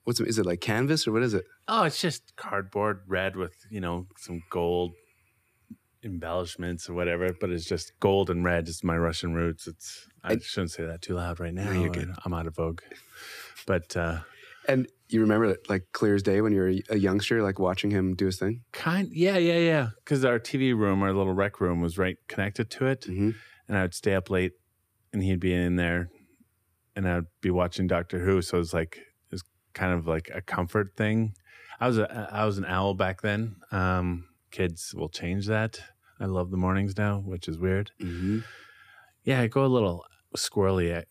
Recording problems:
none

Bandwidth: 15 kHz